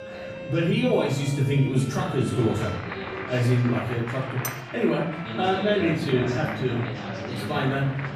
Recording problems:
off-mic speech; far
room echo; noticeable; dies away in 0.7 s
chatter from many people; loud; throughout; 9 dB below the speech
background music; noticeable; throughout; 15 dB below the speech
clattering dishes; noticeable; at 4.5 s; peak 10 dB below the speech

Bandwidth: 14.5 kHz